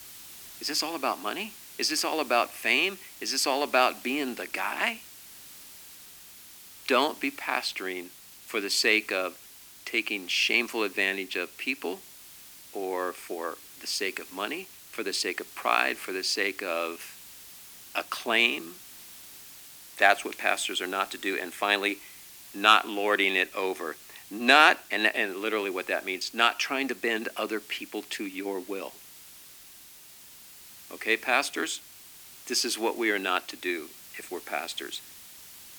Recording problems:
thin; somewhat; fading below 300 Hz
hiss; noticeable; throughout; 20 dB below the speech

